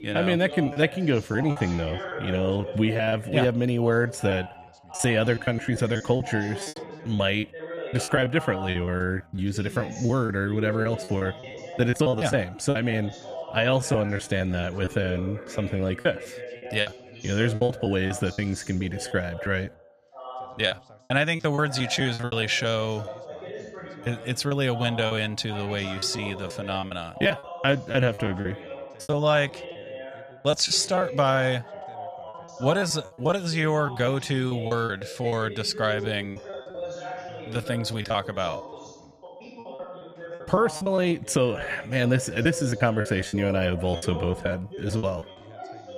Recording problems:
background chatter; noticeable; throughout; 2 voices, 15 dB below the speech
choppy; very; 13% of the speech affected

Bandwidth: 14.5 kHz